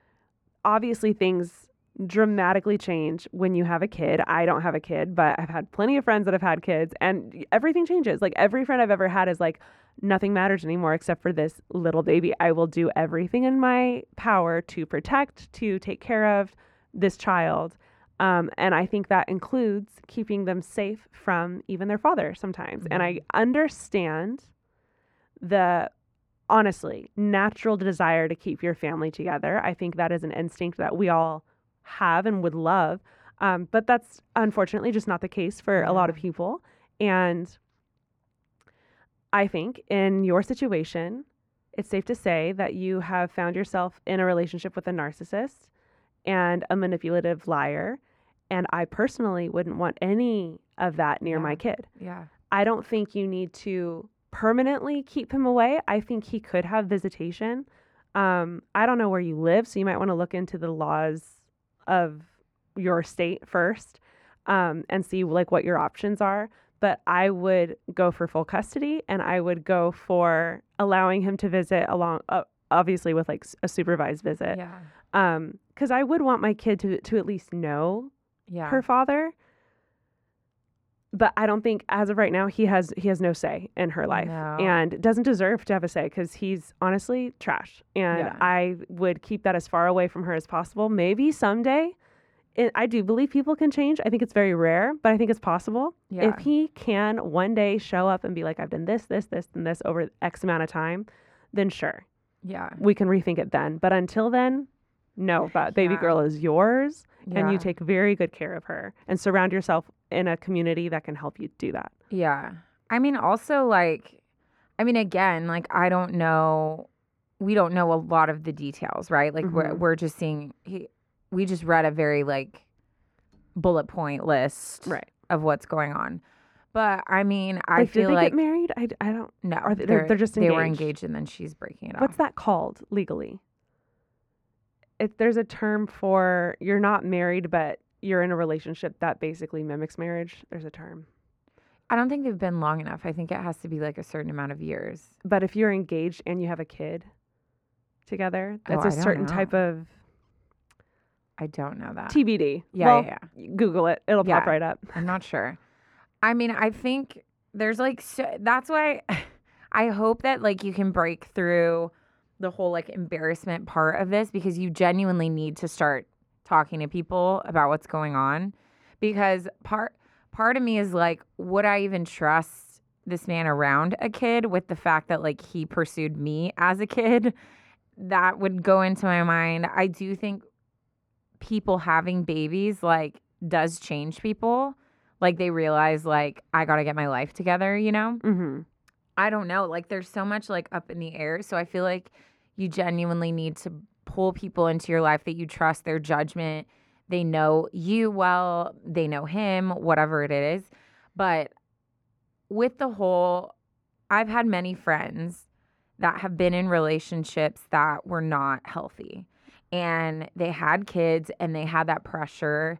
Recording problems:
muffled; very; fading above 3.5 kHz

